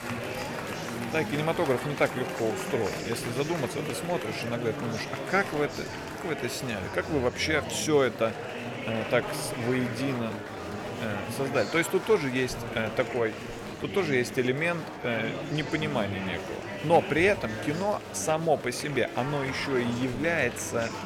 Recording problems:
murmuring crowd; loud; throughout; 6 dB below the speech

